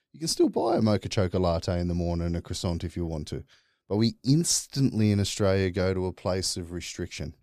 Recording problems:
none

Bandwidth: 15 kHz